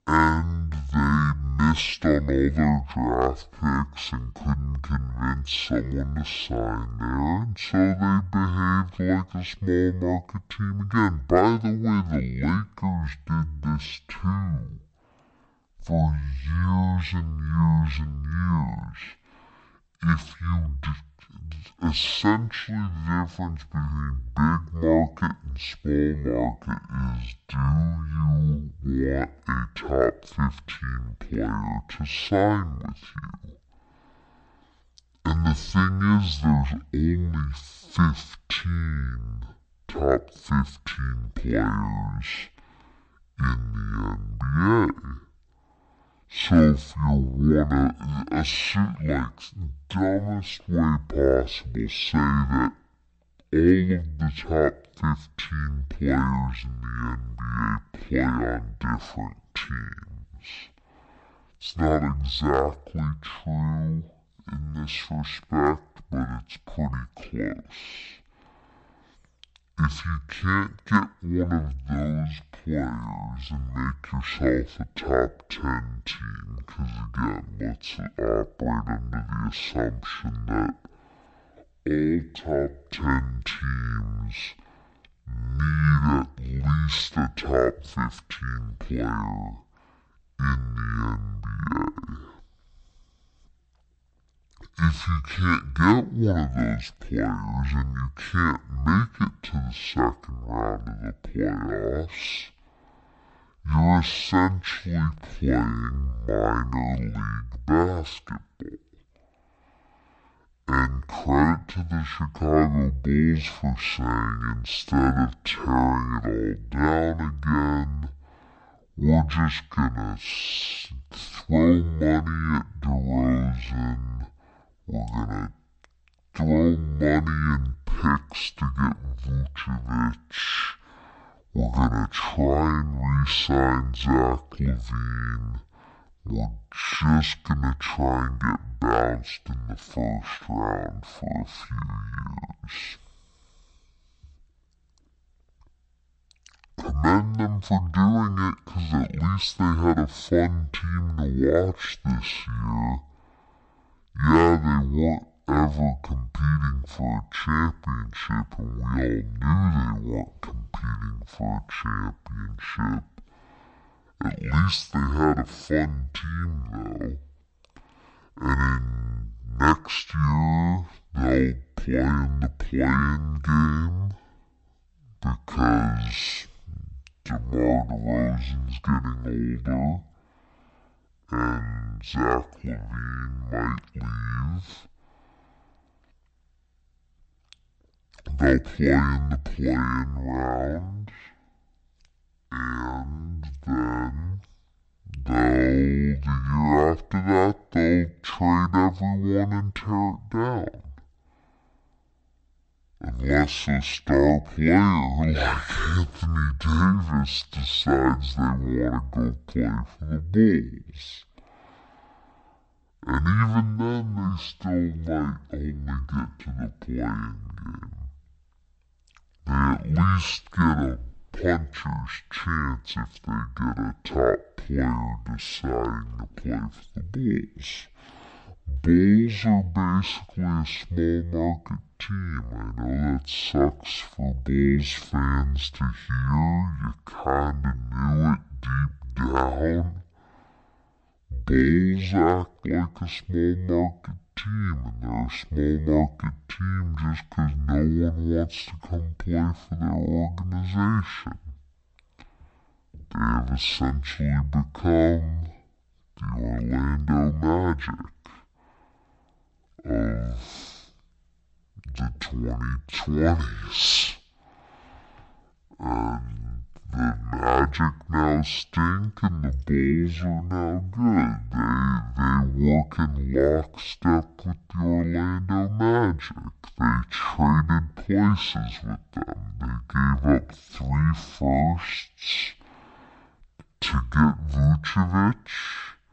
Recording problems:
wrong speed and pitch; too slow and too low; 0.5 times normal speed

